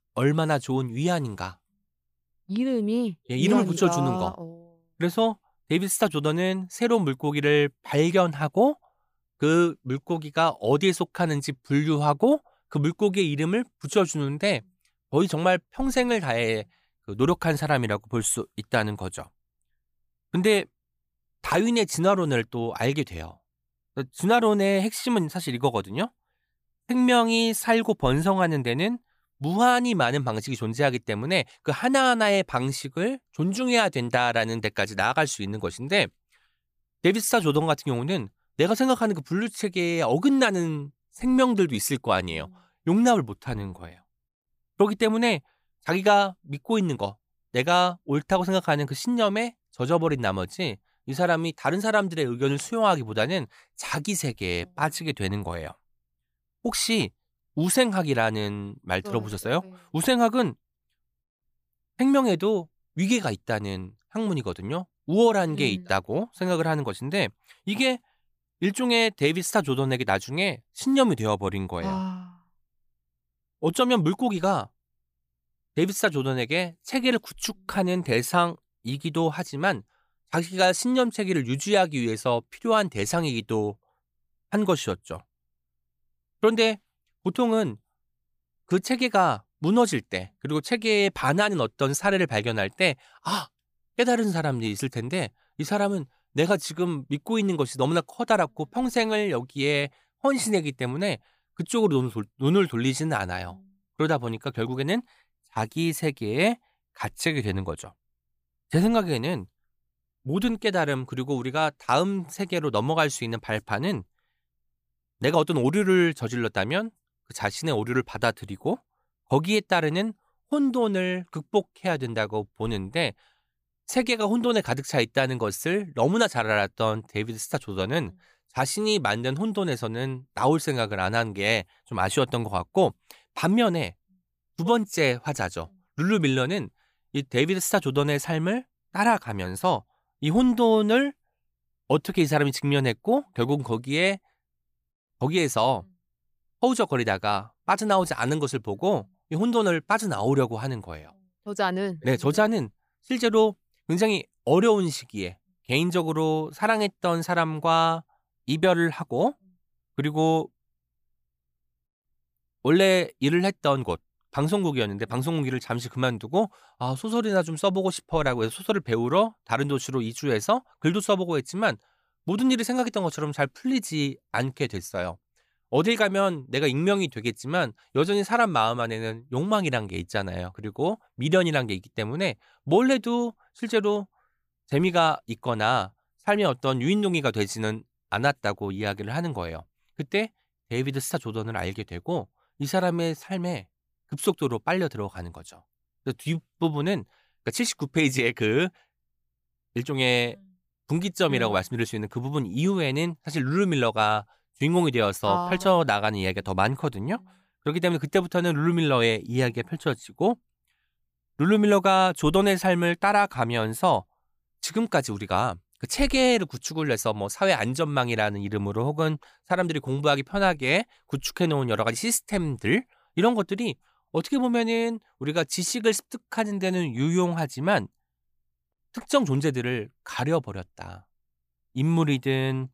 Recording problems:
none

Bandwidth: 15 kHz